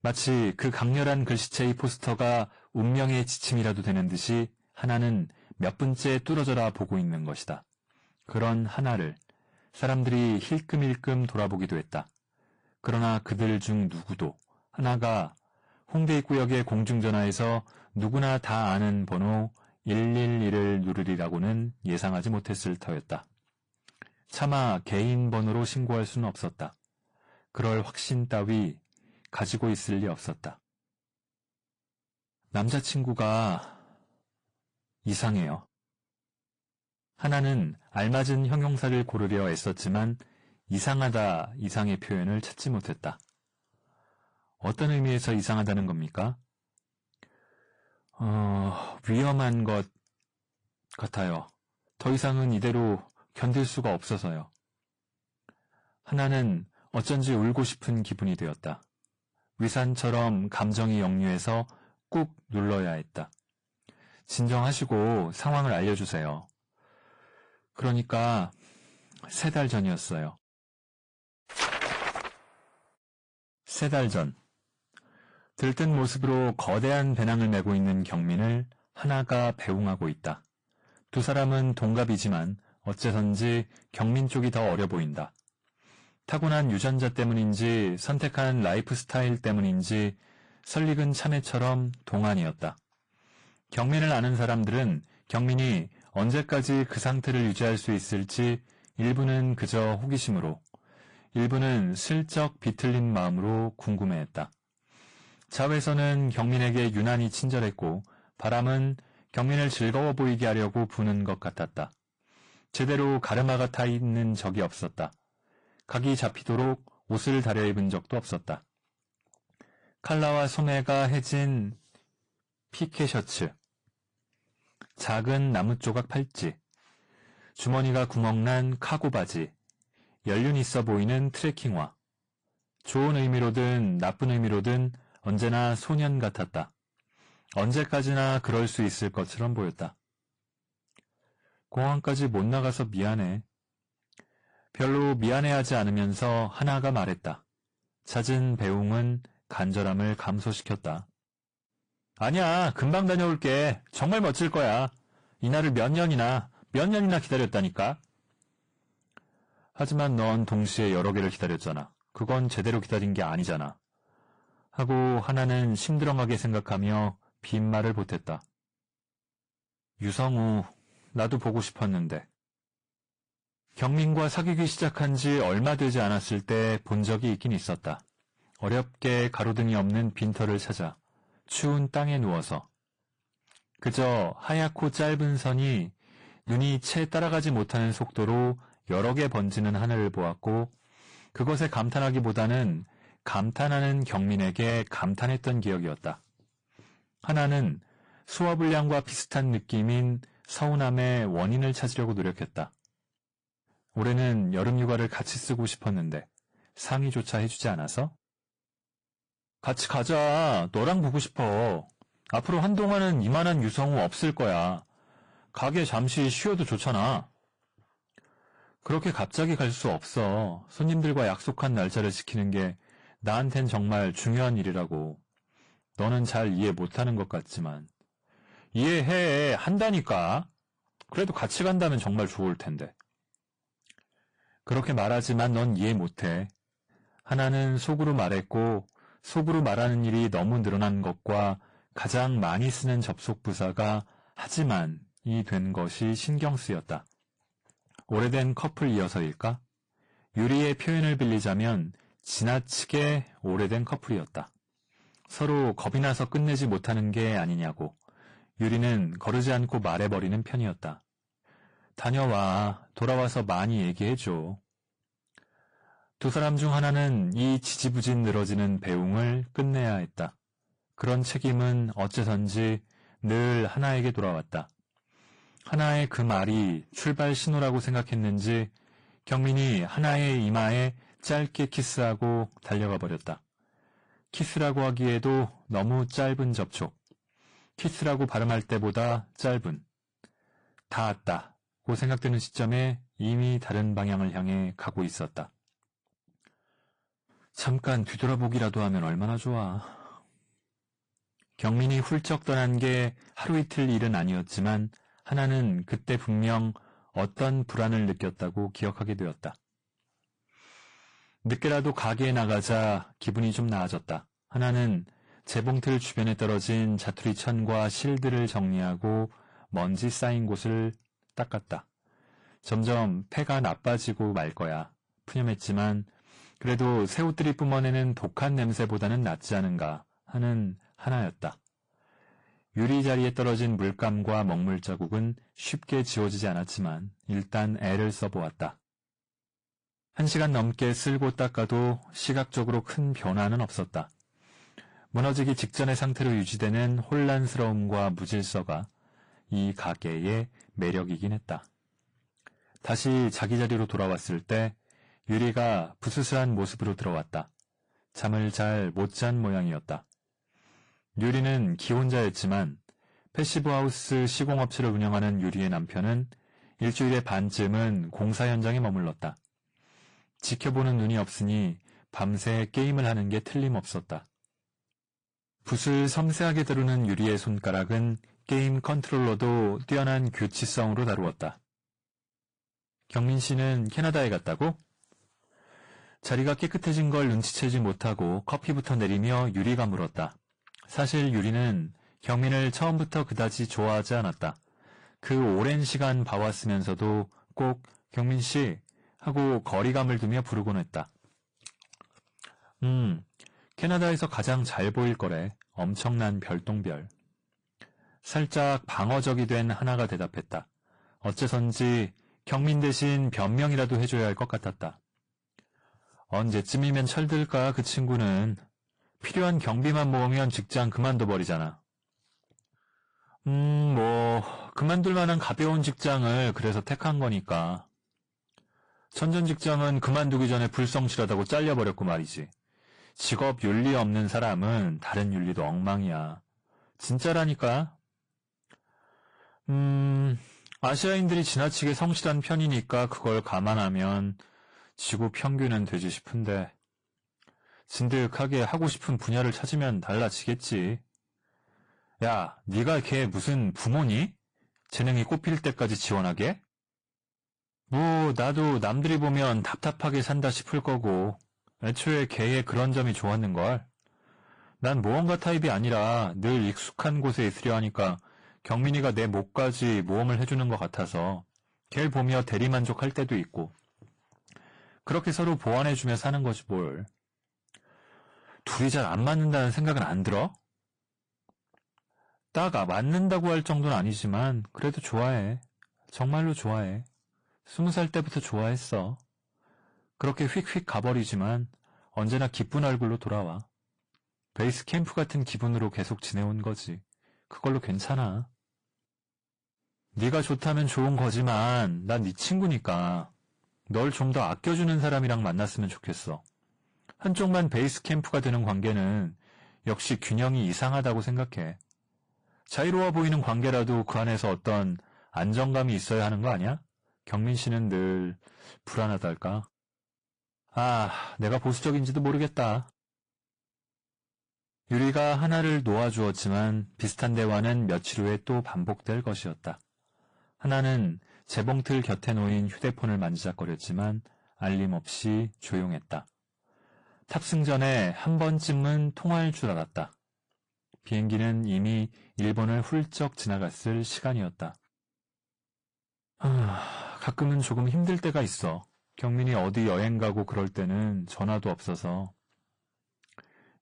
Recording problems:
distortion; slight; 10 dB below the speech
garbled, watery; slightly; nothing above 9 kHz

